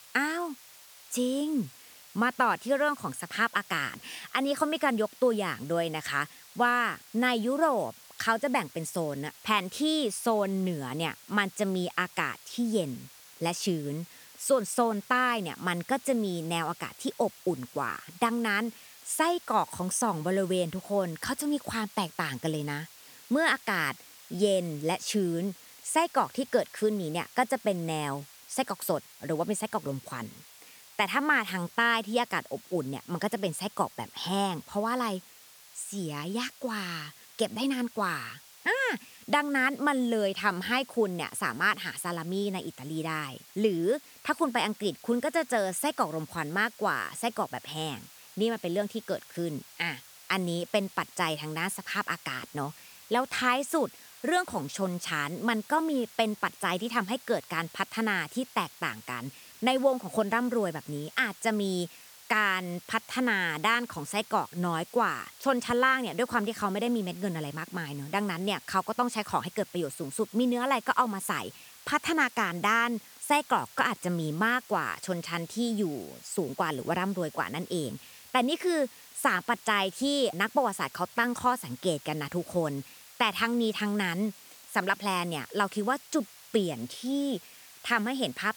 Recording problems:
hiss; noticeable; throughout; 20 dB below the speech

